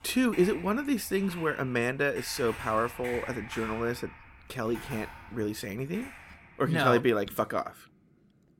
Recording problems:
household noises; noticeable; throughout; 15 dB below the speech

